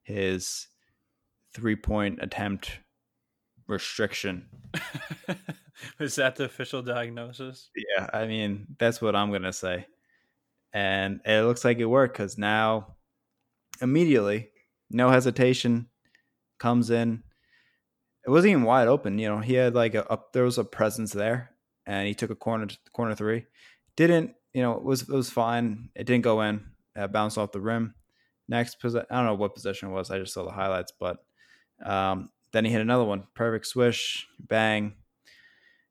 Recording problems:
none

